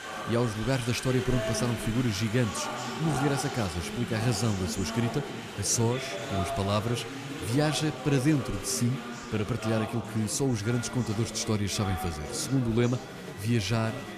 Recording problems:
chatter from many people; loud; throughout; 7 dB below the speech

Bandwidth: 15 kHz